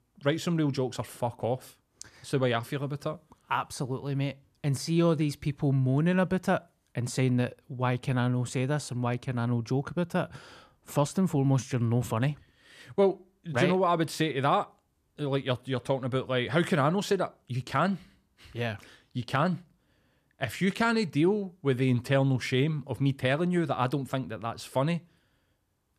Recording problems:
none

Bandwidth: 14.5 kHz